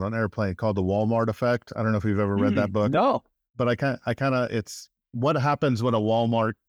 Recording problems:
abrupt cut into speech; at the start

